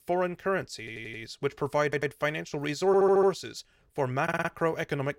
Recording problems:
audio stuttering; 4 times, first at 1 s

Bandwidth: 16 kHz